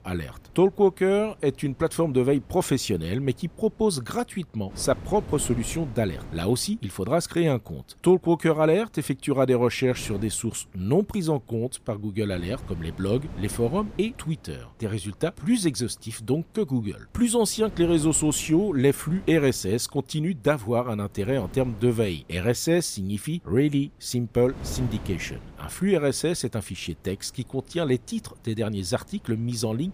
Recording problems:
wind noise on the microphone; occasional gusts; 20 dB below the speech

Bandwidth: 15 kHz